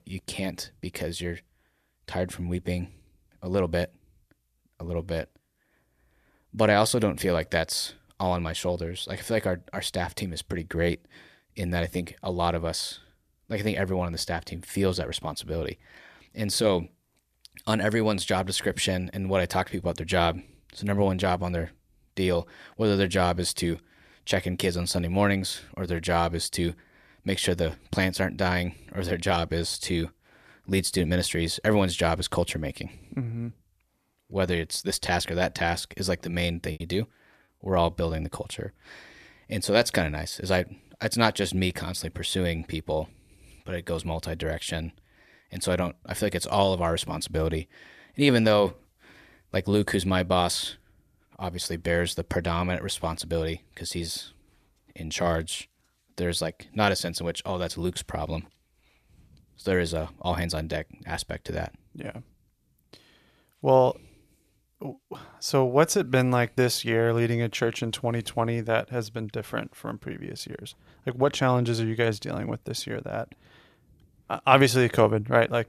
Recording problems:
choppy; very; at 37 s; 12% of the speech affected

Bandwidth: 14.5 kHz